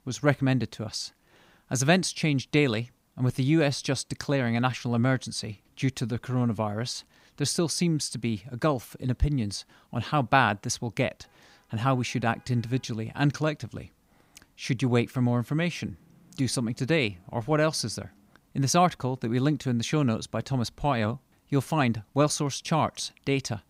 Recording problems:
none

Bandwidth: 15.5 kHz